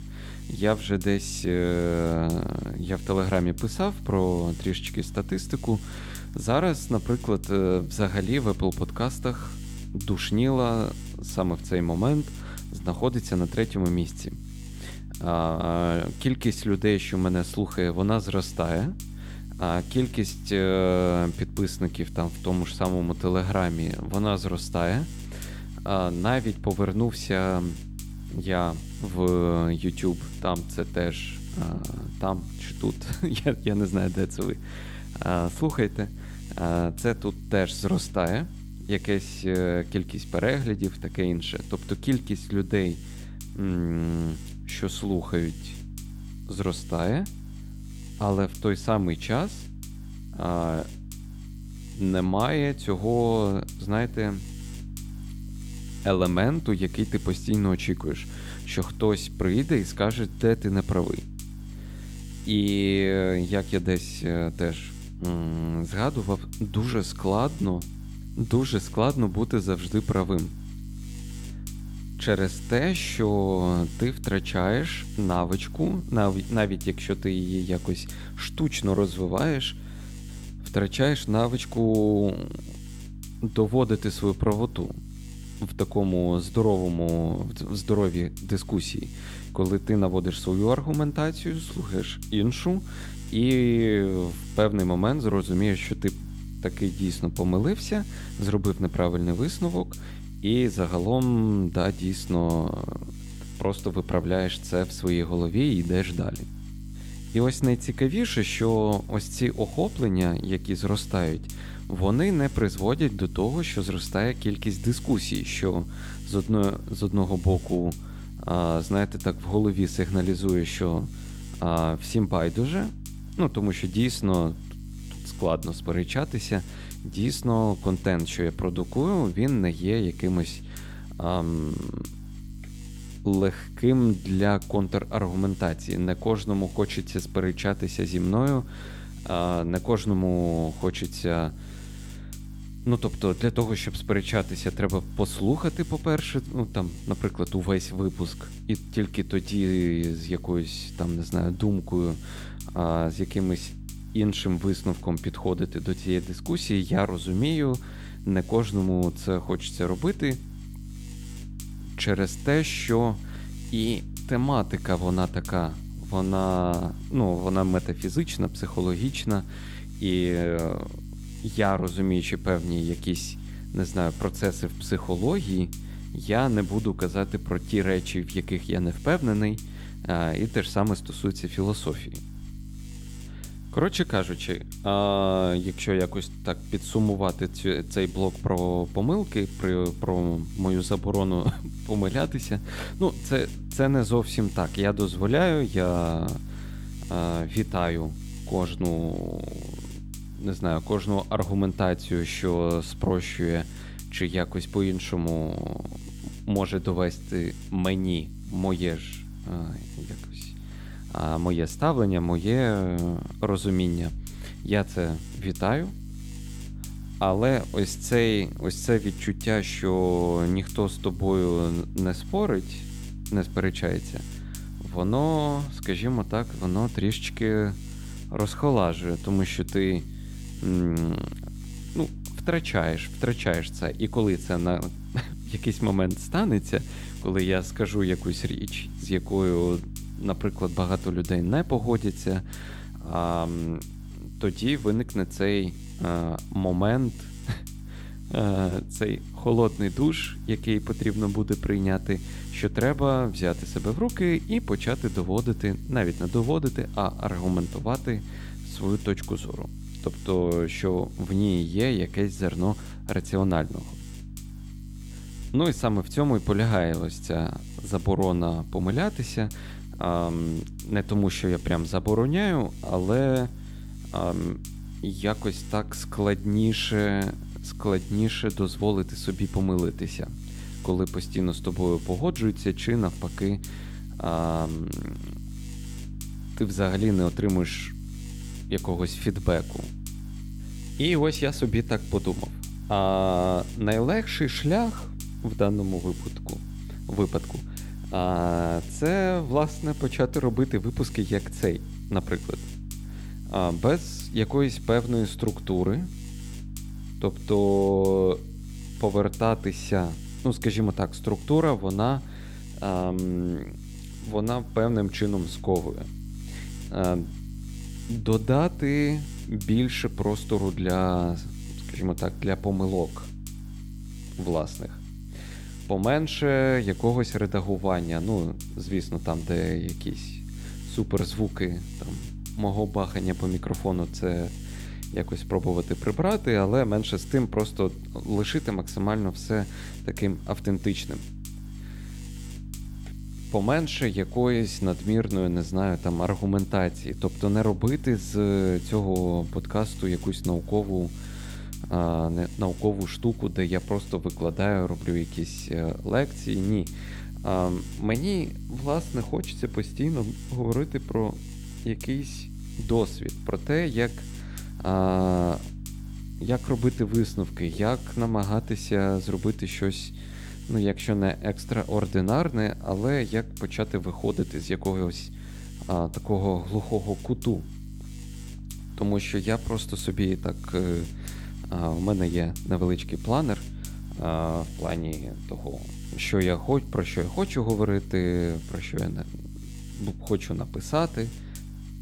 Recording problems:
electrical hum; noticeable; throughout; 50 Hz, 20 dB below the speech

